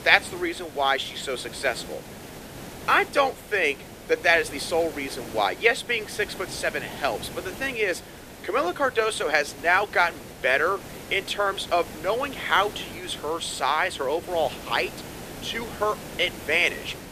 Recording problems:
thin; somewhat; fading below 300 Hz
hiss; noticeable; throughout; 15 dB below the speech

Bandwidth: 14.5 kHz